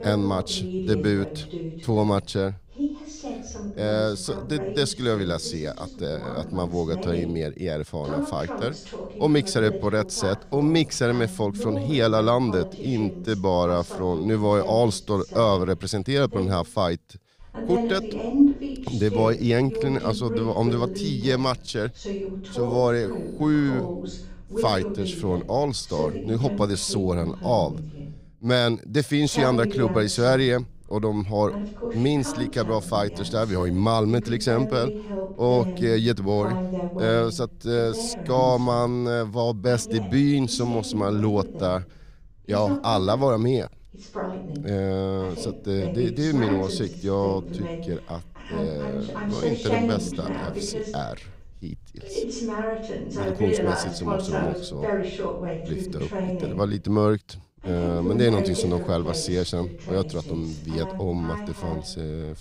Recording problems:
voice in the background; loud; throughout; 7 dB below the speech

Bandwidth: 15.5 kHz